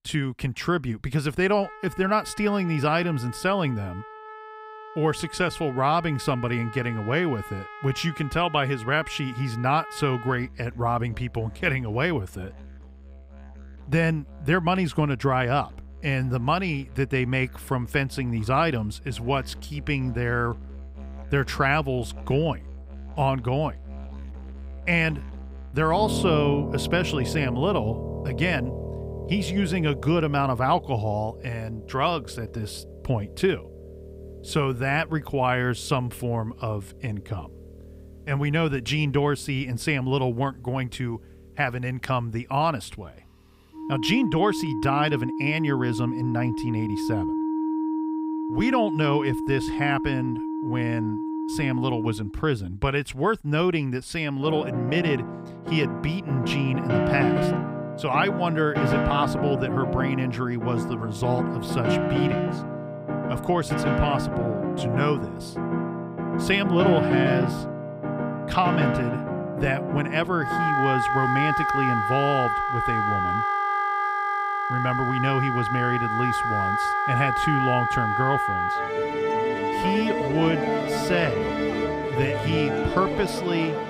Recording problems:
background music; loud; throughout; 1 dB below the speech

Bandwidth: 15.5 kHz